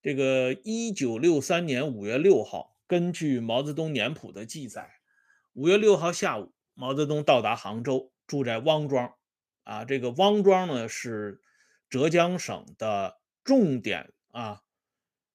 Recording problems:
none

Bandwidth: 15 kHz